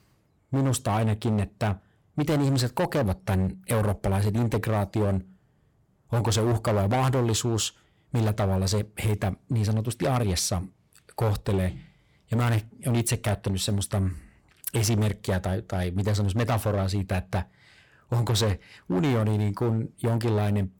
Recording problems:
distortion; slight; 16% of the sound clipped

